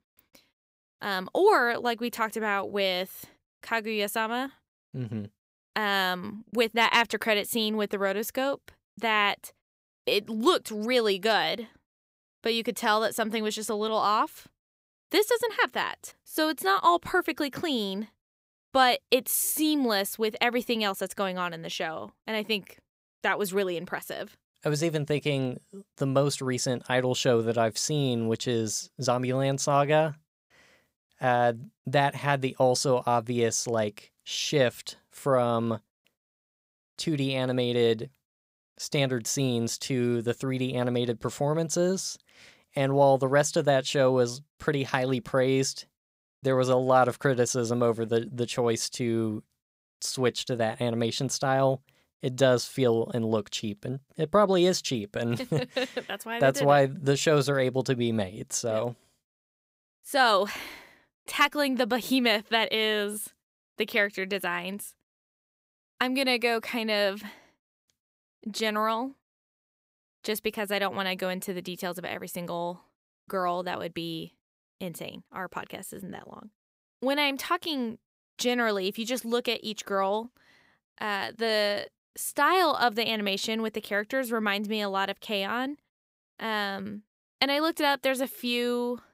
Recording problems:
none

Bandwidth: 15.5 kHz